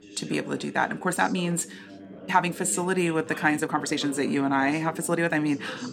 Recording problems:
background chatter; noticeable; throughout; 3 voices, 15 dB below the speech
uneven, jittery; strongly; from 0.5 to 5.5 s

